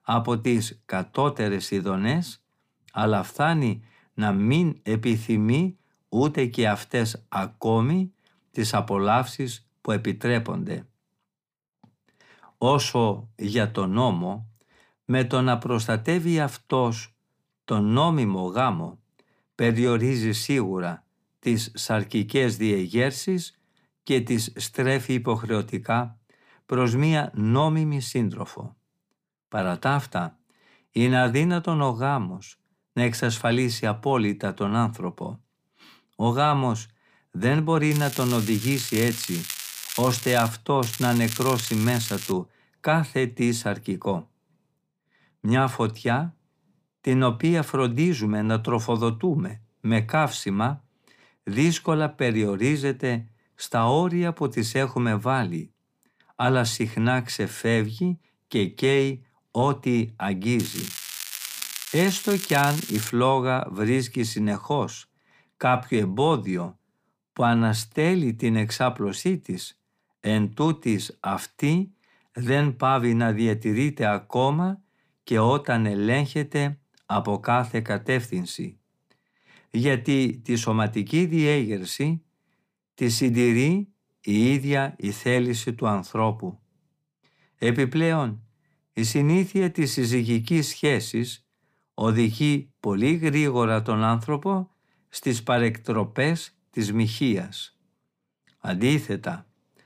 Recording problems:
crackling; loud; from 38 to 40 s, from 41 to 42 s and from 1:01 to 1:03; 8 dB below the speech

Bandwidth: 15 kHz